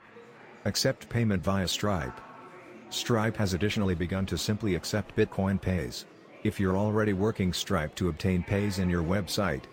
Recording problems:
murmuring crowd; noticeable; throughout; 20 dB below the speech

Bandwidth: 16 kHz